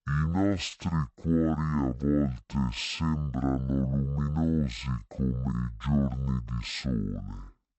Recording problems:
wrong speed and pitch; too slow and too low; 0.5 times normal speed

